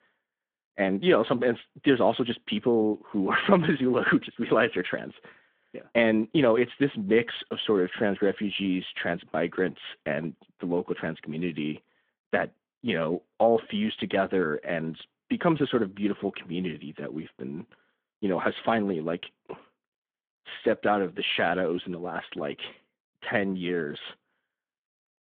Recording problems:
phone-call audio

